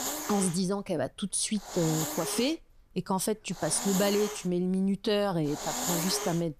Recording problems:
hiss; loud; throughout; 5 dB below the speech

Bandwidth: 14.5 kHz